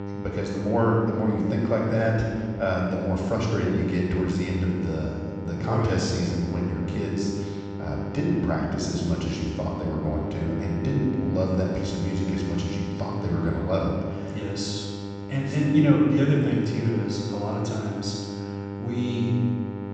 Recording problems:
room echo; strong; dies away in 1.5 s
off-mic speech; far
high frequencies cut off; noticeable; nothing above 8 kHz
electrical hum; loud; throughout; 50 Hz, 9 dB below the speech

